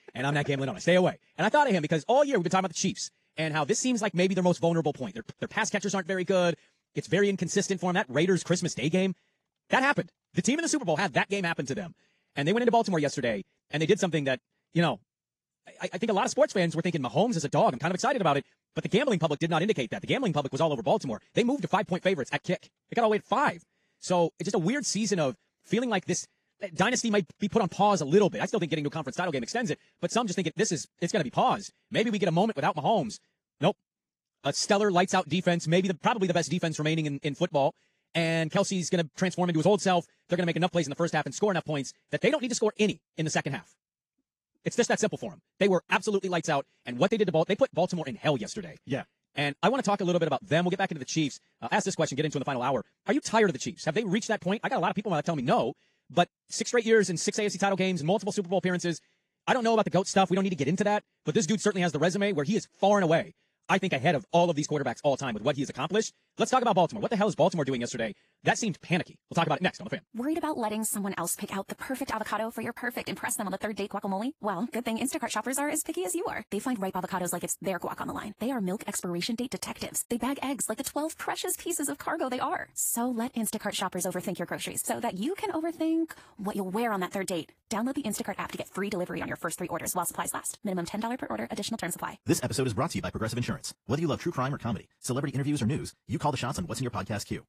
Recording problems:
wrong speed, natural pitch; too fast; 1.7 times normal speed
garbled, watery; slightly; nothing above 14.5 kHz

